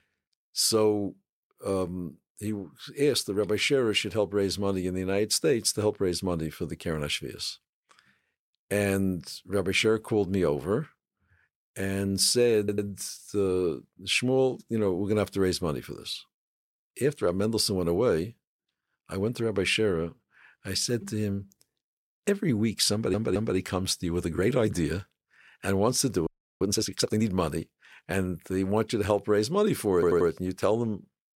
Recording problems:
audio stuttering; at 13 s, at 23 s and at 30 s
audio freezing; at 26 s

